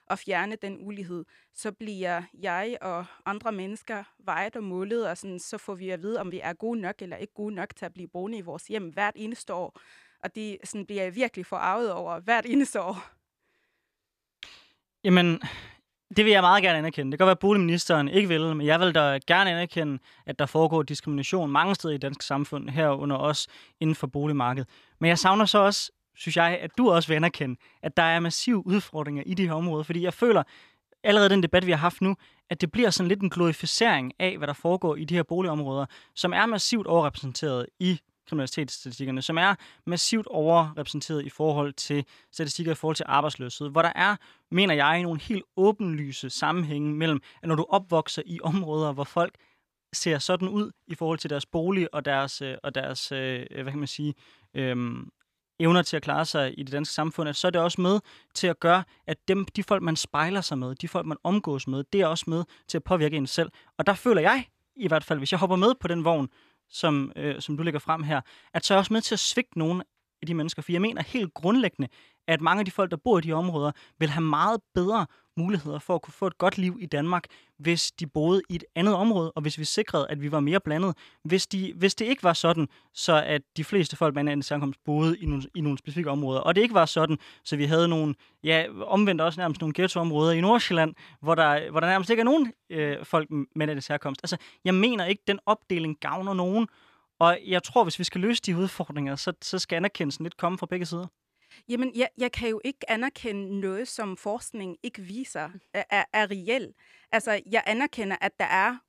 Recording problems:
none

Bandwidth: 14.5 kHz